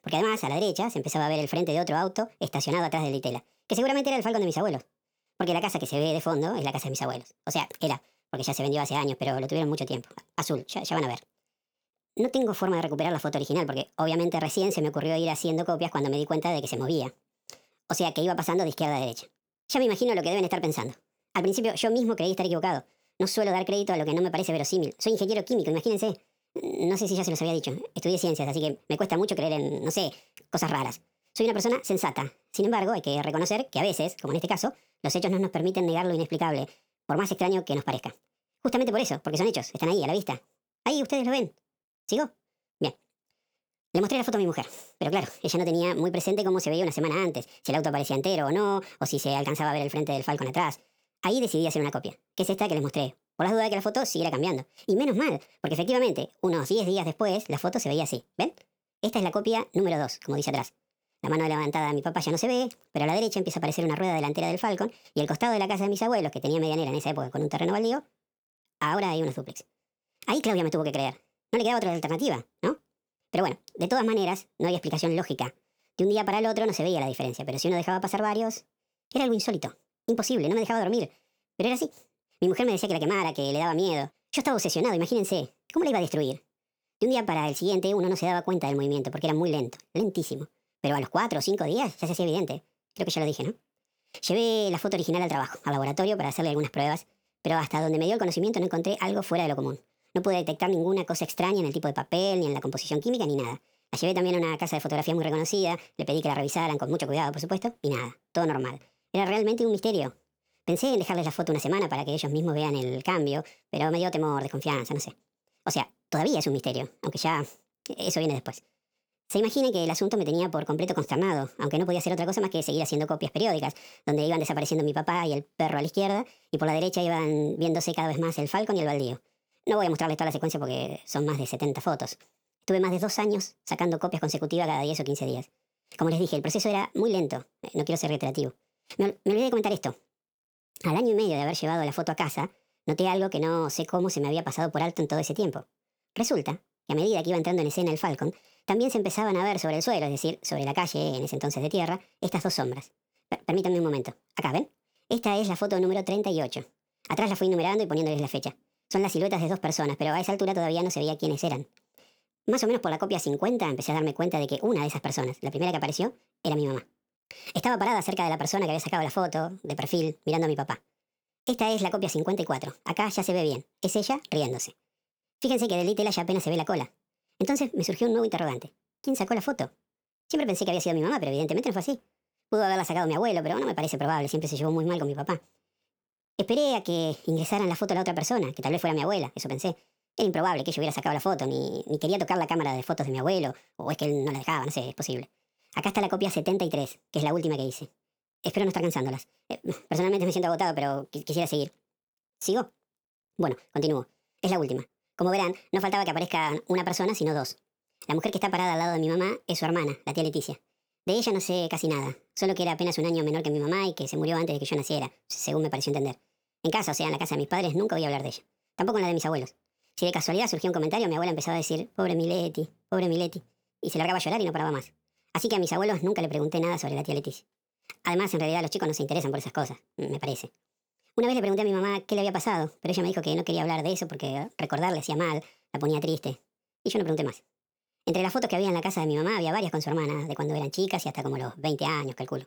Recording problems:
wrong speed and pitch; too fast and too high; 1.5 times normal speed

